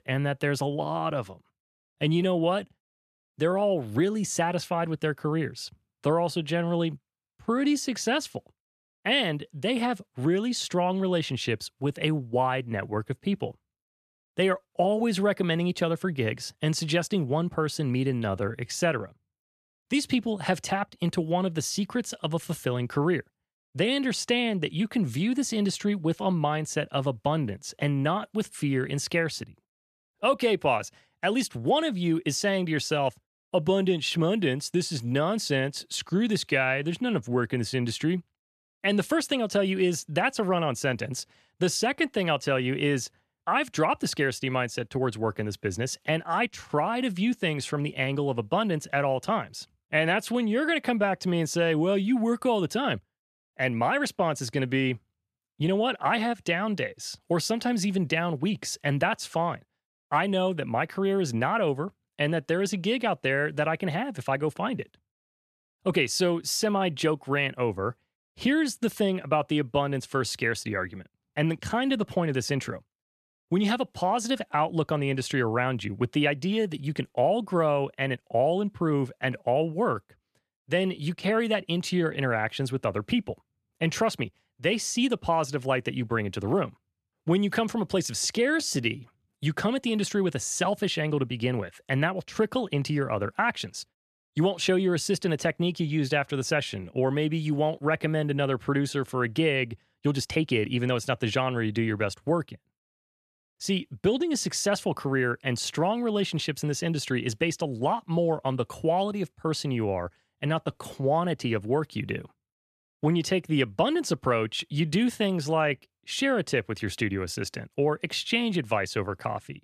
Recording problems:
uneven, jittery; strongly; from 1.5 s to 1:56

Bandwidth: 13.5 kHz